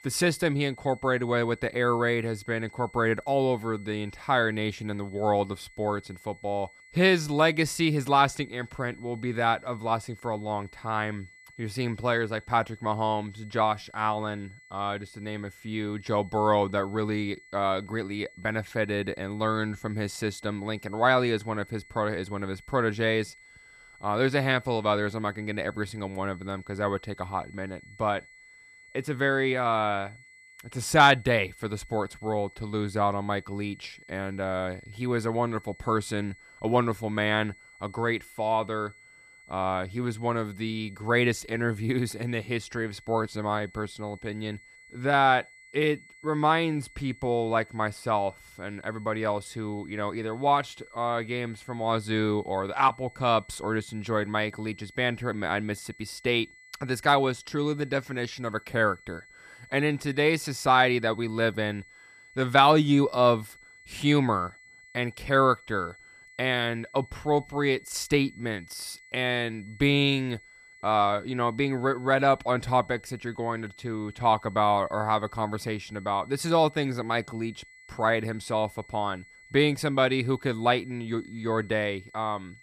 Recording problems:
high-pitched whine; faint; throughout; 2 kHz, 25 dB below the speech

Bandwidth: 14.5 kHz